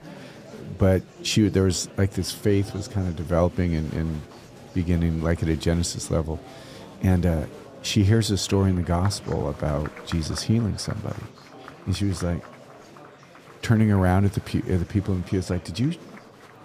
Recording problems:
murmuring crowd; noticeable; throughout; 20 dB below the speech

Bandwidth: 14.5 kHz